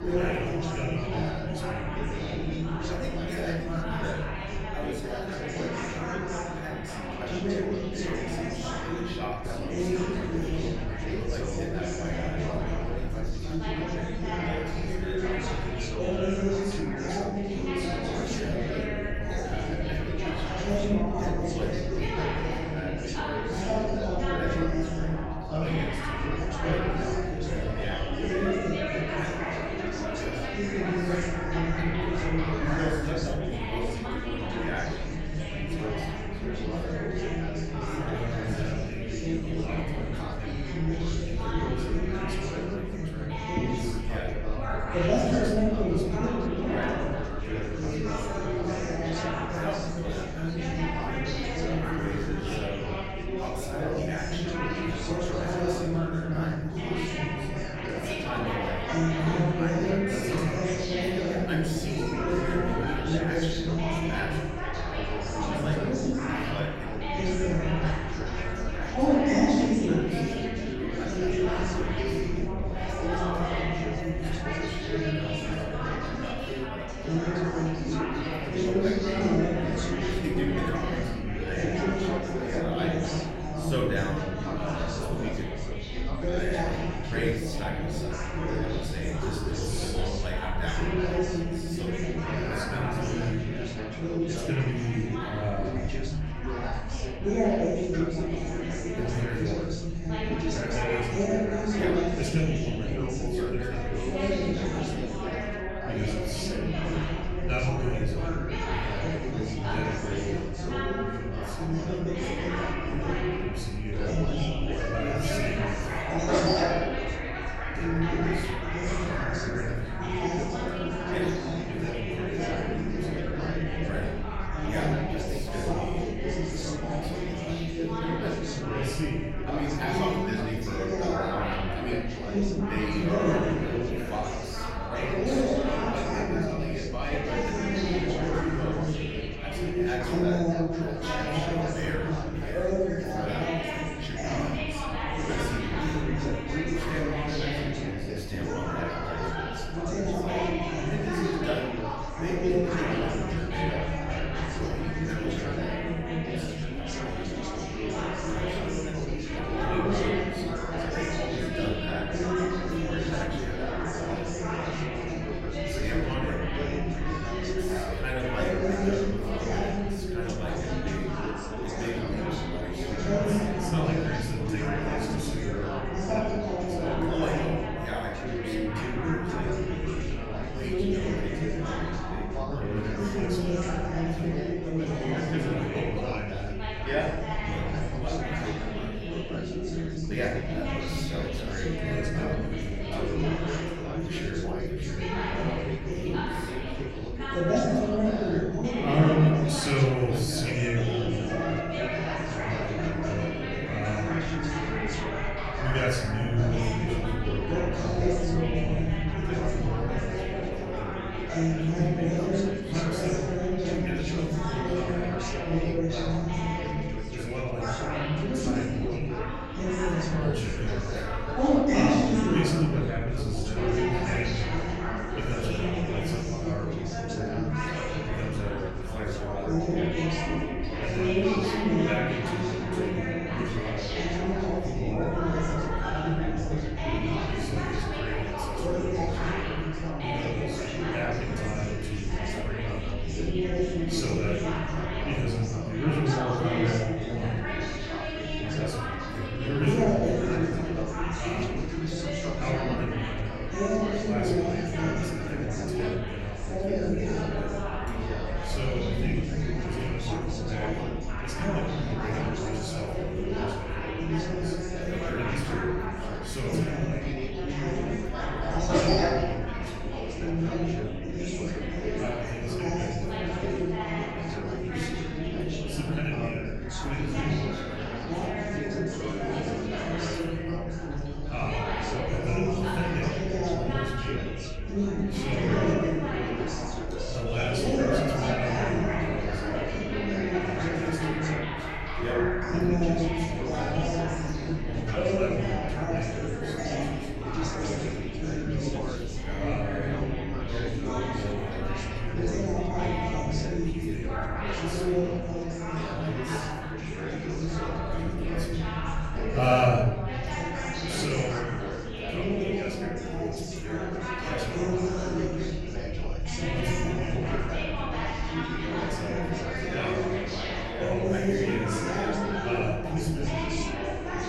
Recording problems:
off-mic speech; far
room echo; noticeable; dies away in 0.9 s
chatter from many people; very loud; throughout; 4 dB above the speech
low rumble; faint; throughout; 20 dB below the speech

